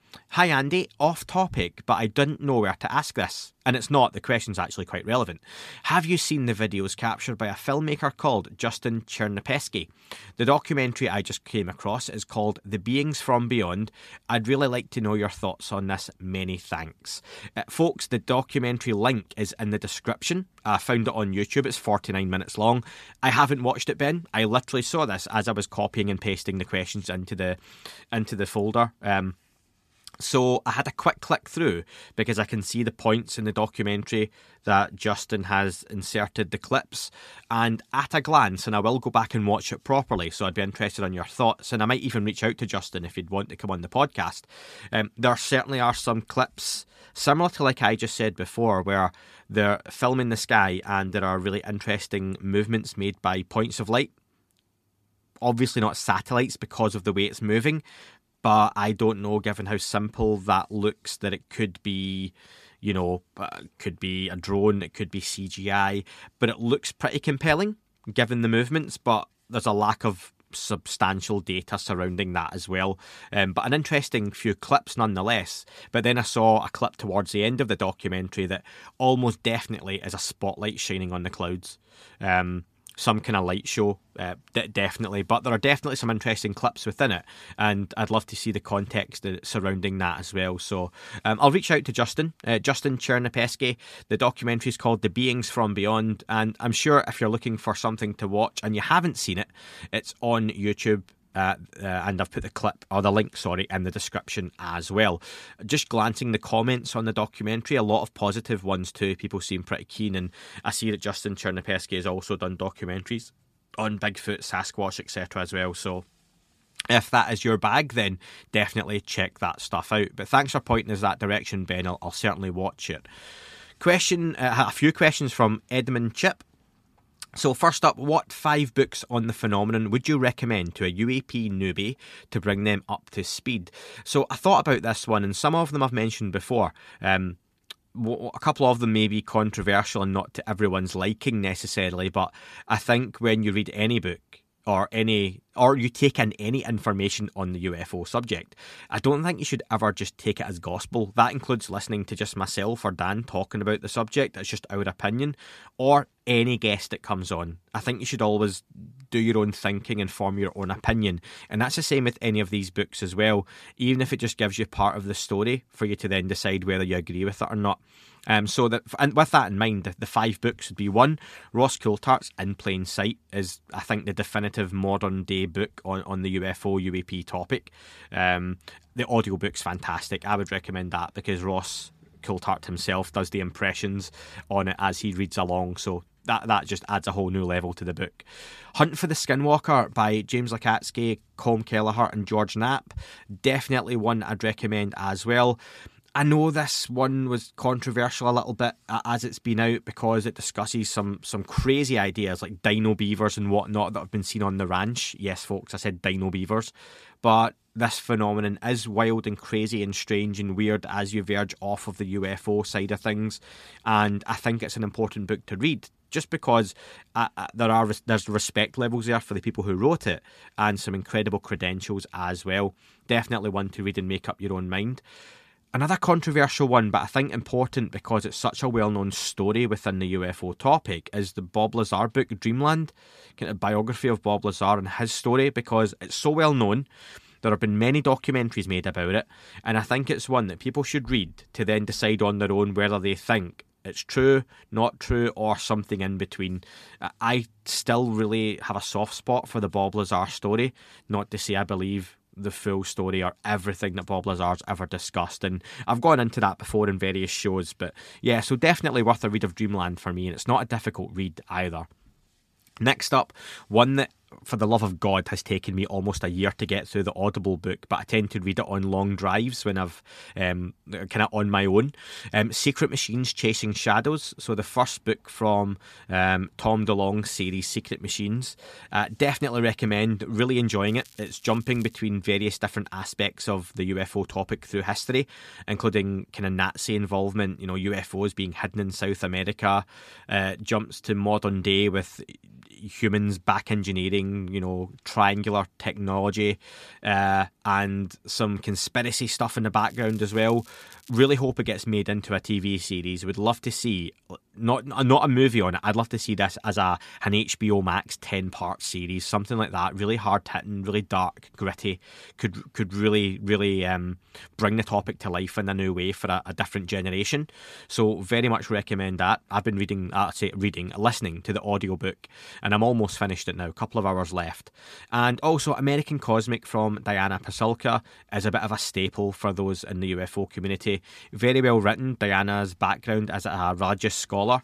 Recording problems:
crackling; faint; from 4:41 to 4:42 and from 5:00 to 5:01; 25 dB below the speech

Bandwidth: 14.5 kHz